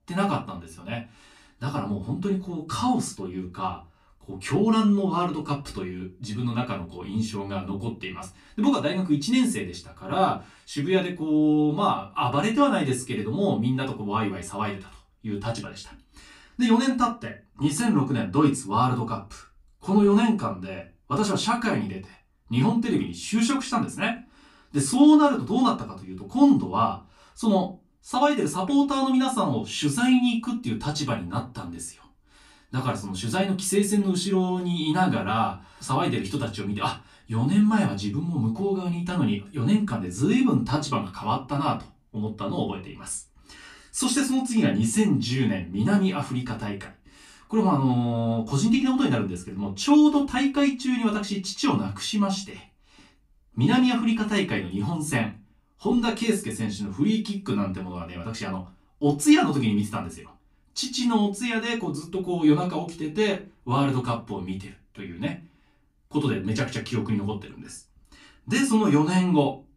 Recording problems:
off-mic speech; far
room echo; very slight; dies away in 0.2 s

